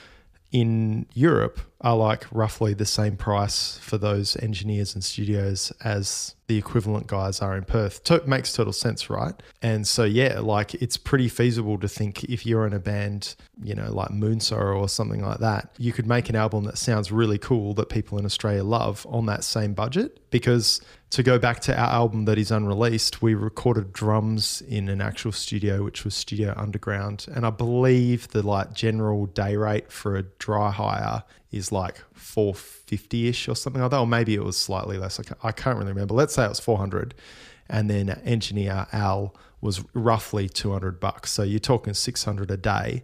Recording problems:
none

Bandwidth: 15 kHz